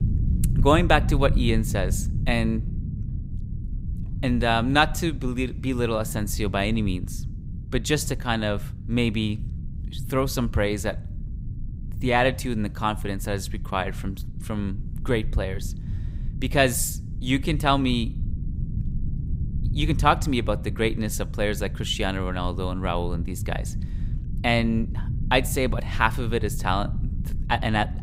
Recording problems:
low rumble; noticeable; throughout; 20 dB below the speech

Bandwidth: 15.5 kHz